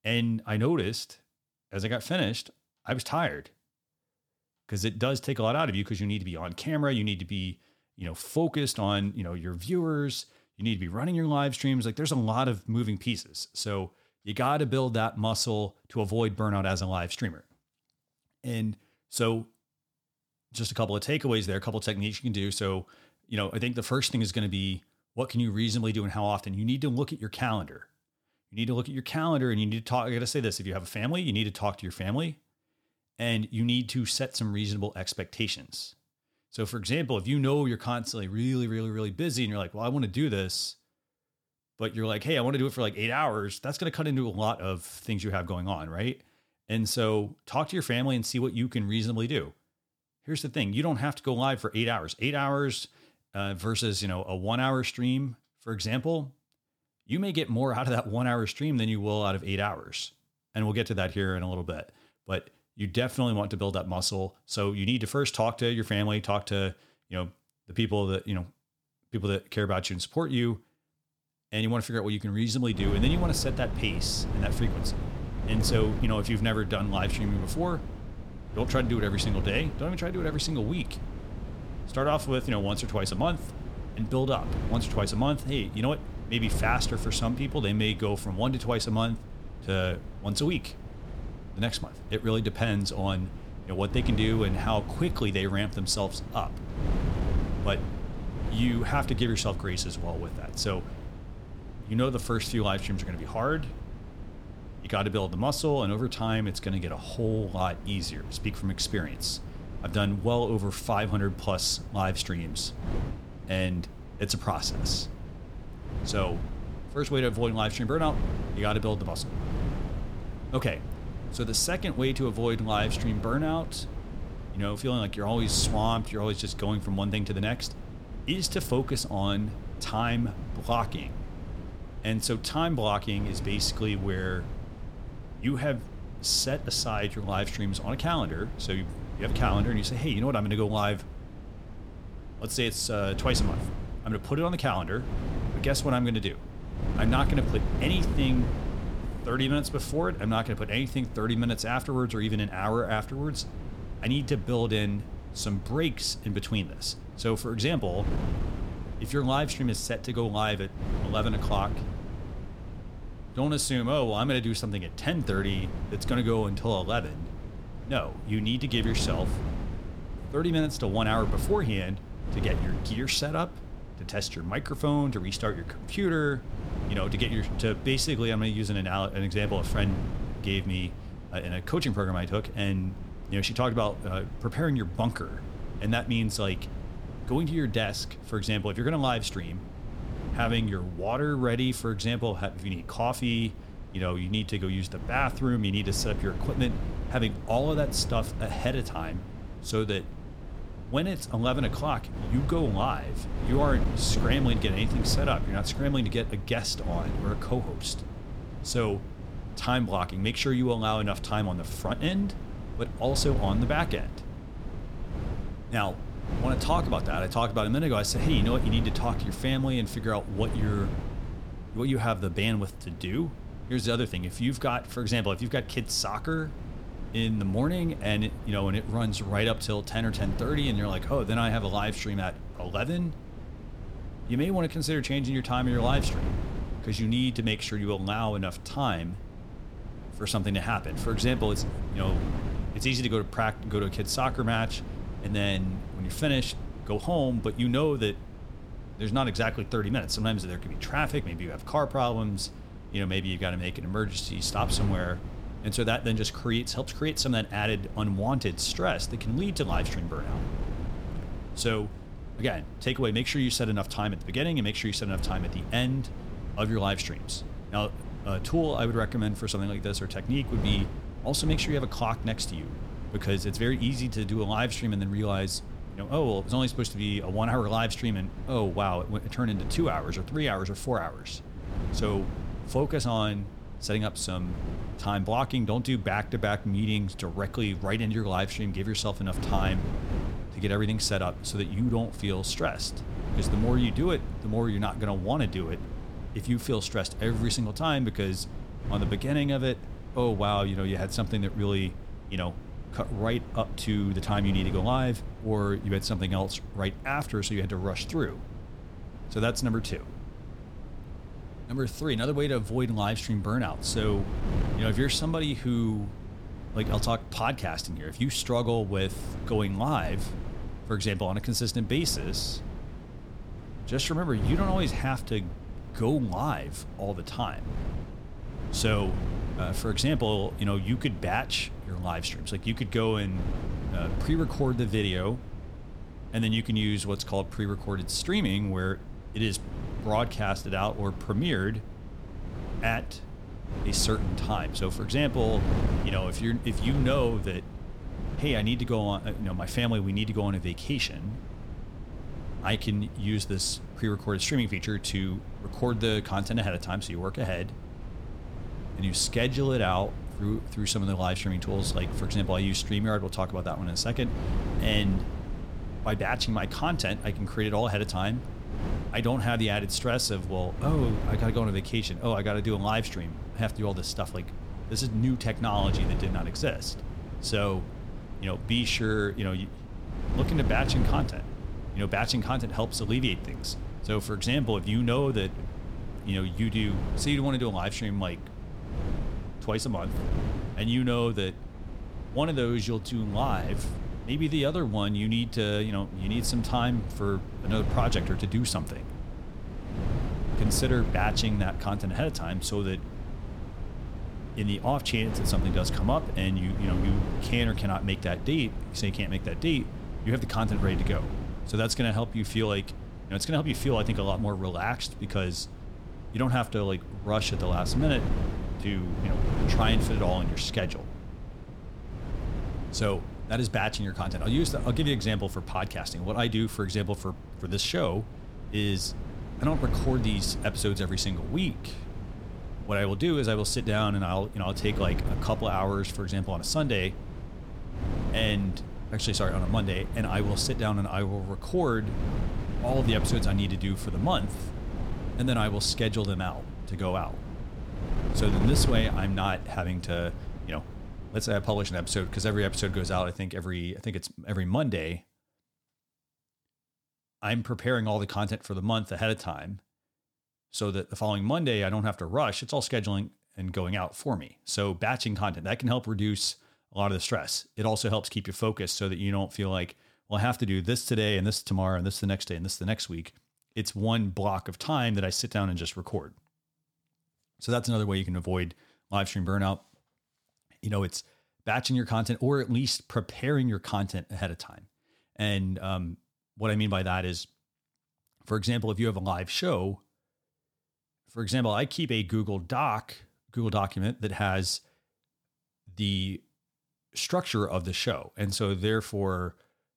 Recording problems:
wind noise on the microphone; occasional gusts; from 1:13 to 7:33; 15 dB below the speech

